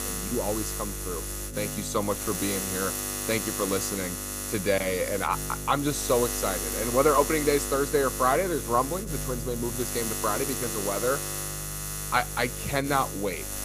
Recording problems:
electrical hum; loud; throughout; 50 Hz, 6 dB below the speech

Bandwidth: 15 kHz